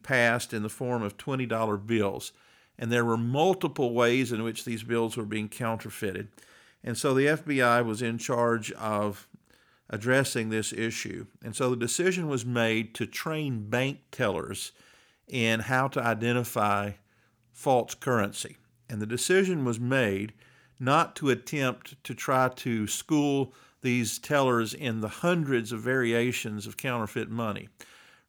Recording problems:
none

